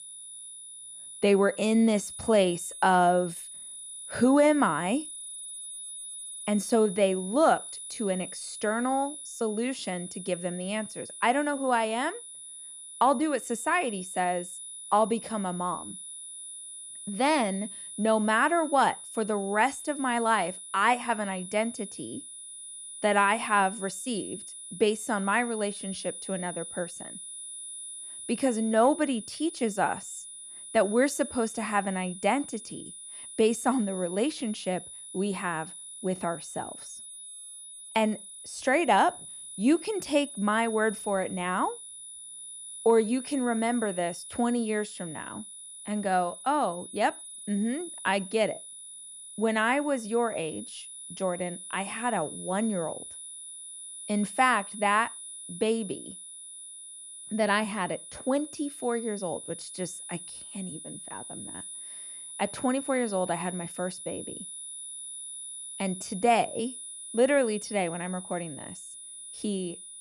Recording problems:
high-pitched whine; noticeable; throughout; 10 kHz, 10 dB below the speech

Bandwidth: 14.5 kHz